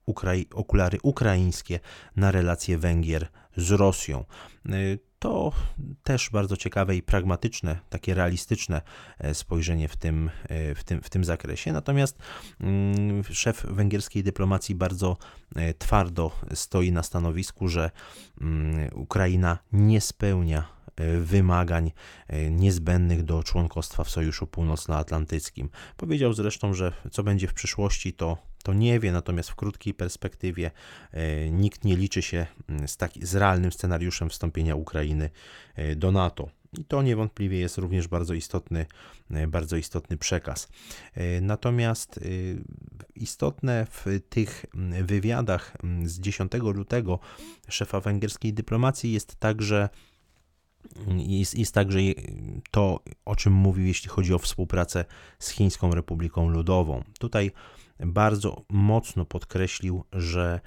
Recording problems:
none

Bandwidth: 17 kHz